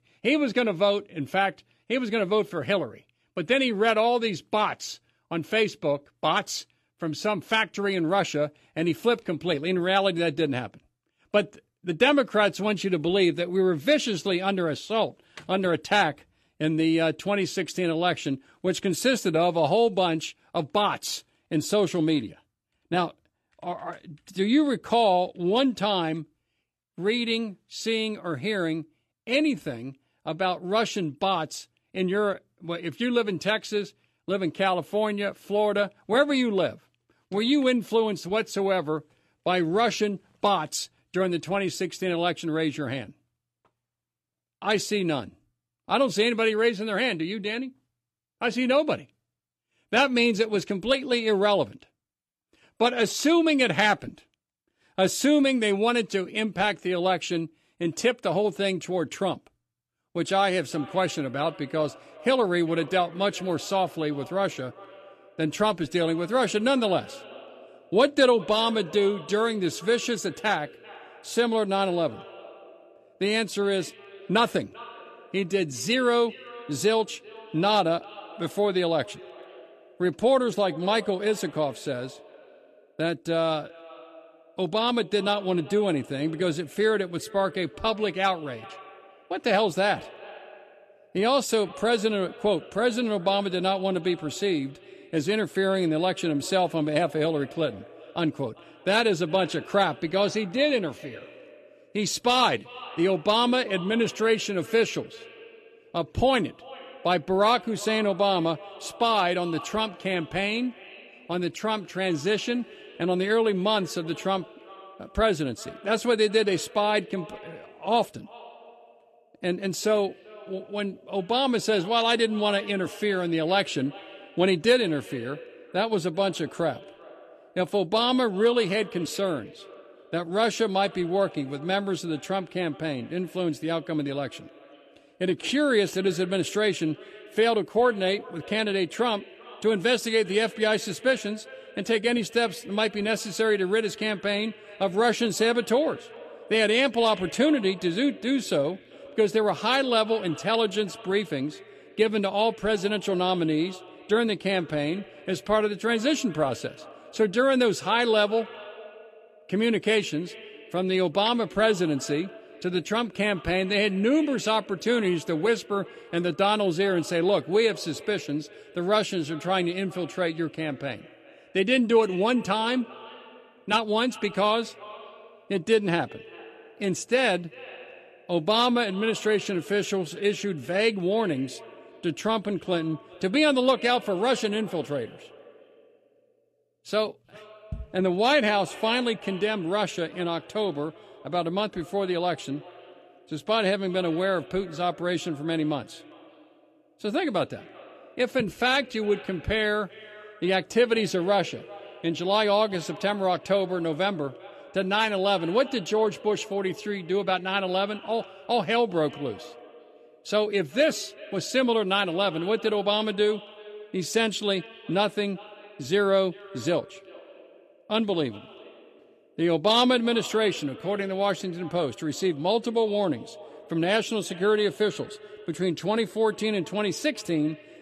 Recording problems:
echo of what is said; faint; from 1:00 on; 390 ms later, 20 dB below the speech

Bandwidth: 13.5 kHz